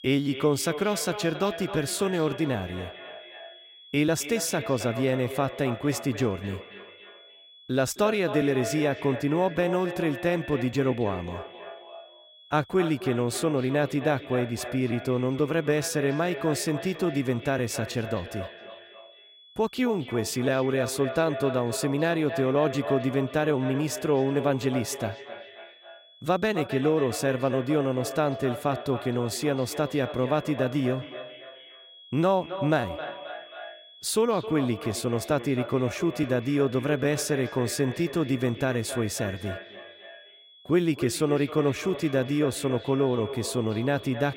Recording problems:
echo of what is said; strong; throughout; 260 ms later, 10 dB below the speech
high-pitched whine; faint; throughout; 3.5 kHz, 20 dB below the speech

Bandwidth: 16 kHz